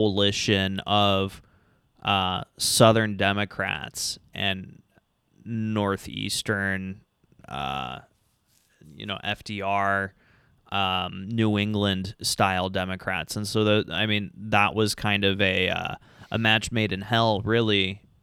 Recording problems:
abrupt cut into speech; at the start

